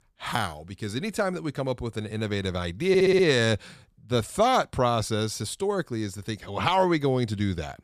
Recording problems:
audio stuttering; at 3 s

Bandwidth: 14.5 kHz